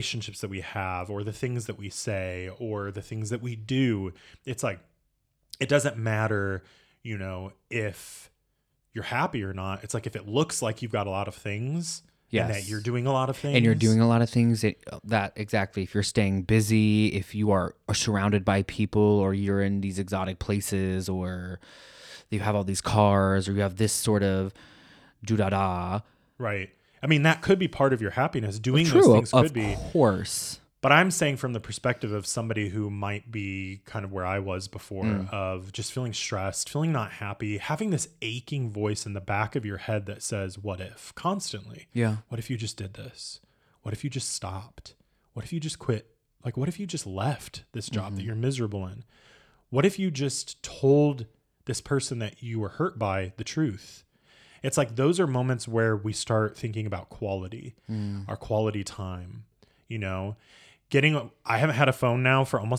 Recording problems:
abrupt cut into speech; at the start and the end

